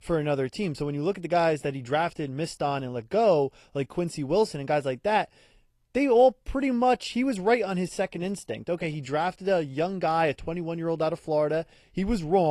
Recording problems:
garbled, watery; slightly
abrupt cut into speech; at the end

